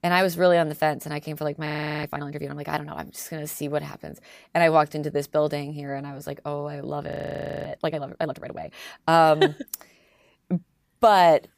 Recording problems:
audio freezing; at 1.5 s and at 7 s for 0.5 s

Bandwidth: 15 kHz